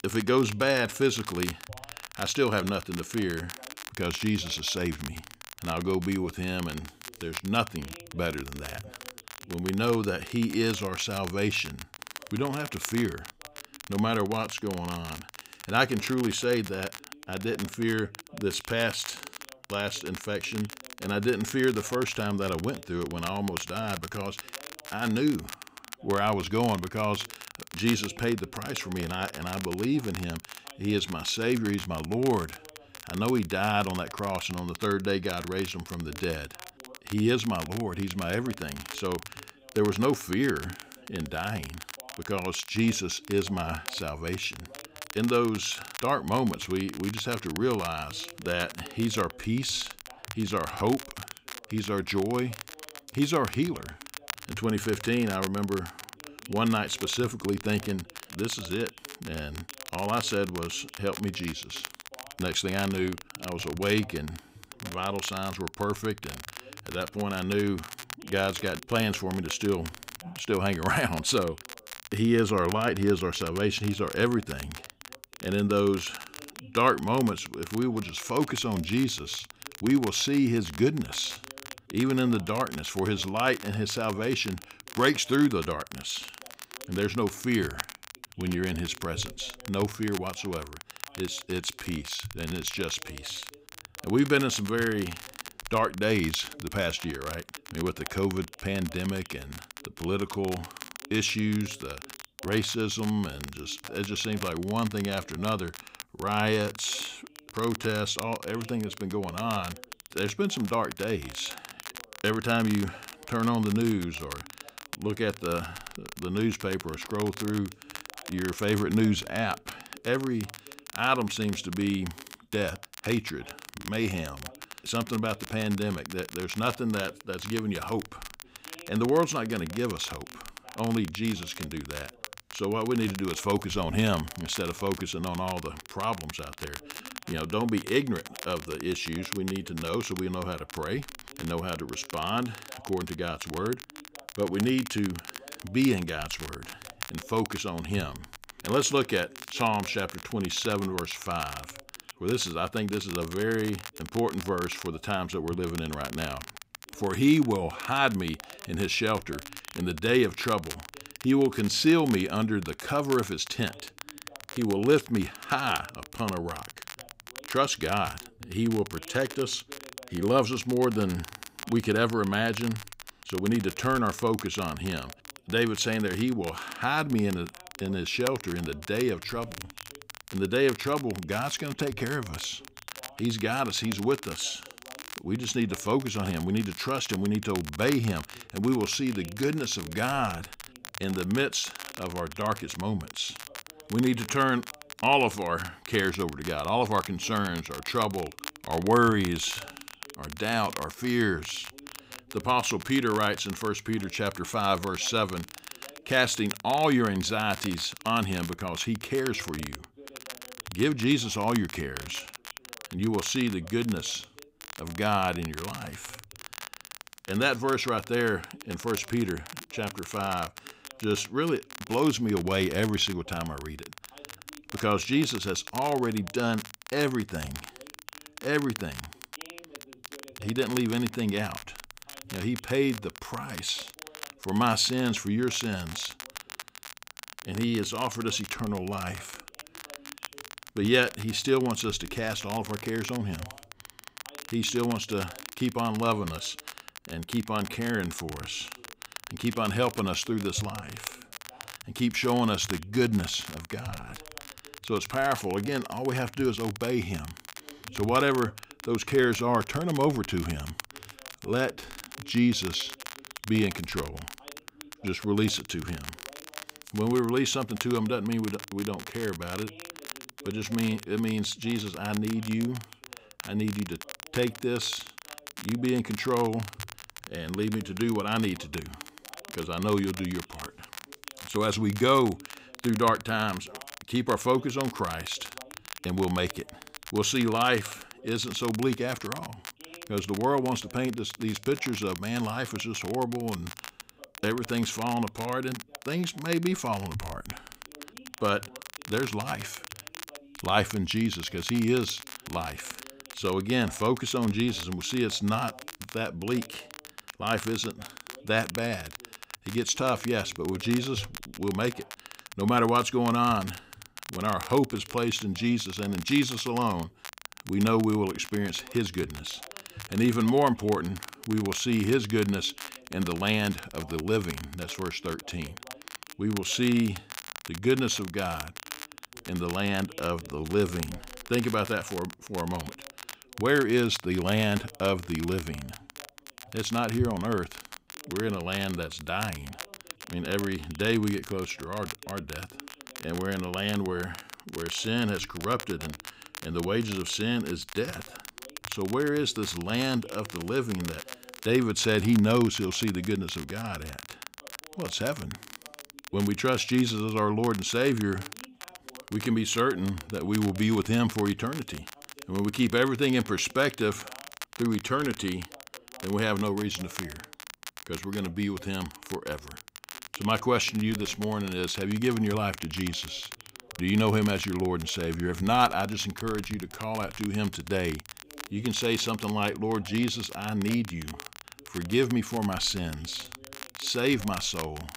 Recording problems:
crackle, like an old record; noticeable; 15 dB below the speech
voice in the background; faint; throughout; 25 dB below the speech

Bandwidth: 15.5 kHz